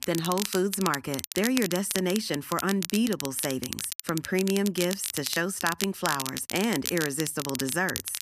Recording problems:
crackle, like an old record; loud; 5 dB below the speech

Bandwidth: 14.5 kHz